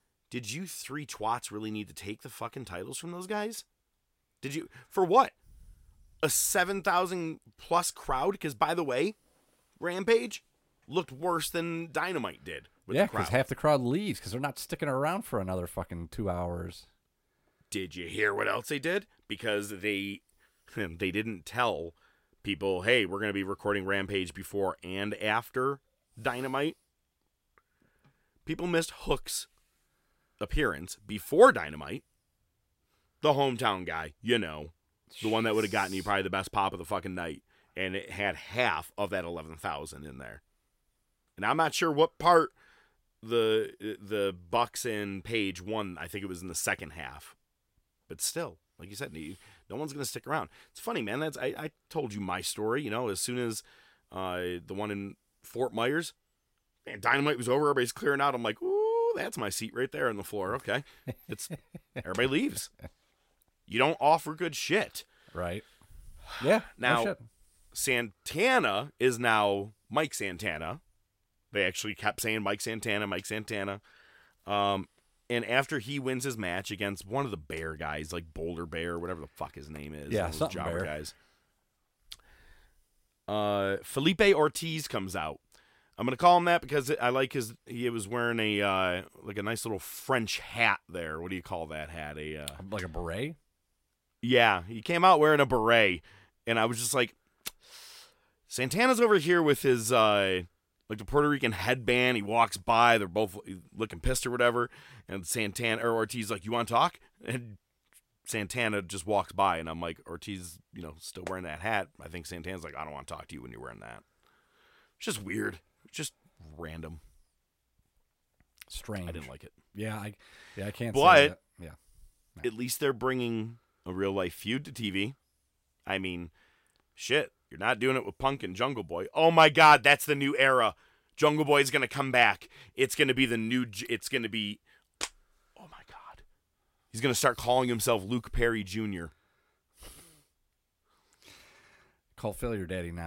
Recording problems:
abrupt cut into speech; at the end

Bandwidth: 16 kHz